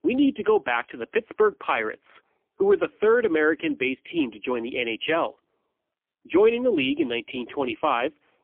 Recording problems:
phone-call audio; poor line; nothing above 3.5 kHz

